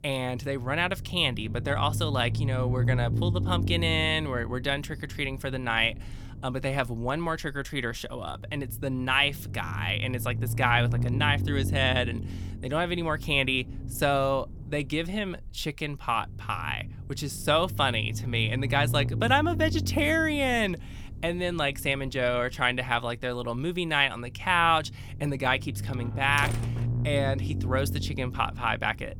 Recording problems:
low rumble; noticeable; throughout; 20 dB below the speech
door banging; noticeable; from 26 to 27 s; peak 7 dB below the speech

